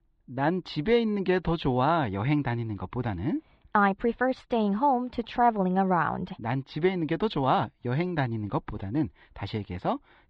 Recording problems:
muffled; slightly; fading above 4 kHz

